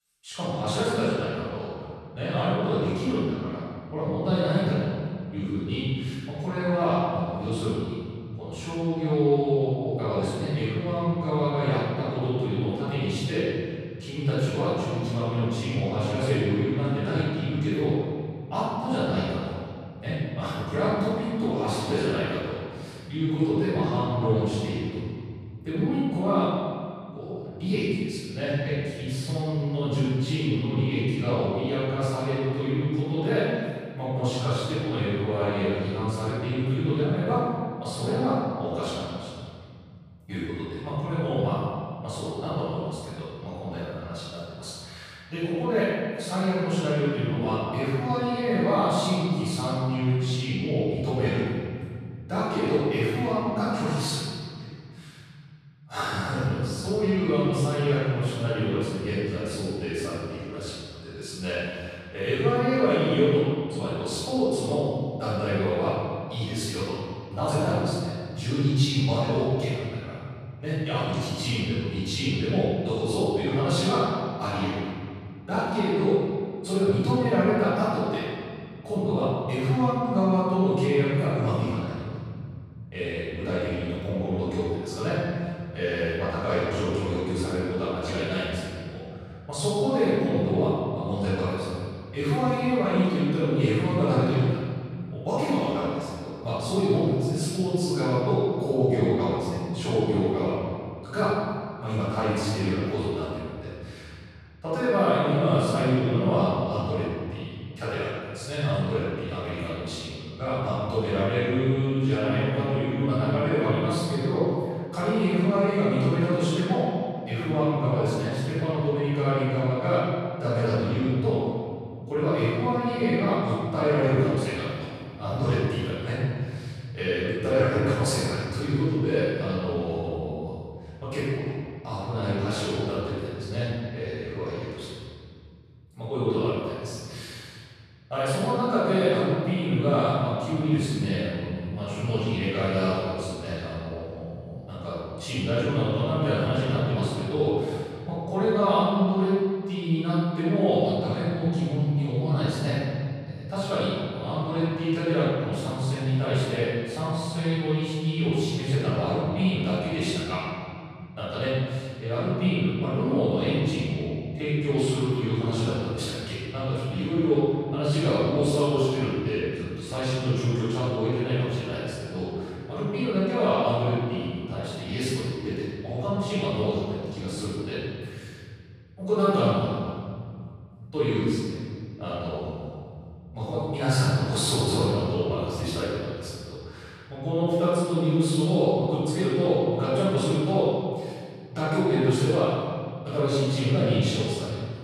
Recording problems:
room echo; strong; dies away in 2.6 s
off-mic speech; far

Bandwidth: 14.5 kHz